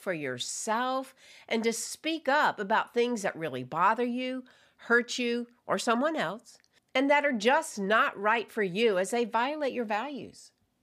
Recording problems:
none

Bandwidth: 15 kHz